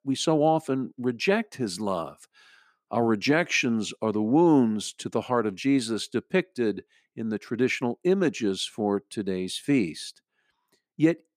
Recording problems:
none

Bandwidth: 14.5 kHz